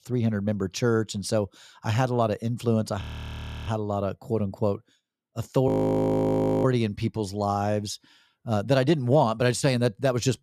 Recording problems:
audio freezing; at 3 s for 0.5 s and at 5.5 s for 1 s

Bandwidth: 14.5 kHz